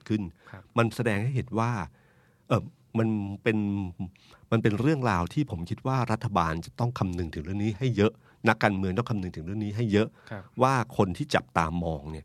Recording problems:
none

